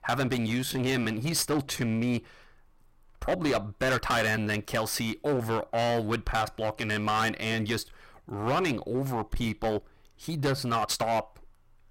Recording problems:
distortion; heavy; 12% of the sound clipped
uneven, jittery; strongly; from 0.5 to 11 s

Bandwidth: 16 kHz